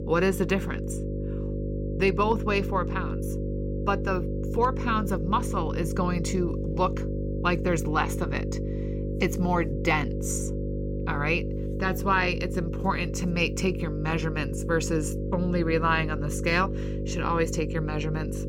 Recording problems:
electrical hum; loud; throughout; 50 Hz, 9 dB below the speech

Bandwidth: 16 kHz